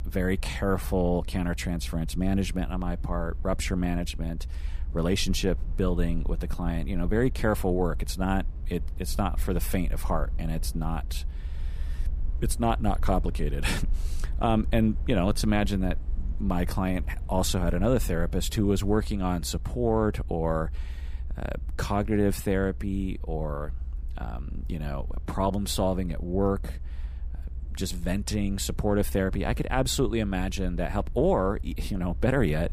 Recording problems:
low rumble; faint; throughout; 25 dB below the speech

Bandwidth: 15 kHz